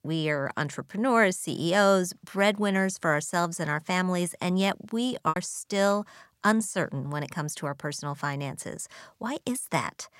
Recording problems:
choppy; occasionally; 1% of the speech affected

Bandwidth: 16 kHz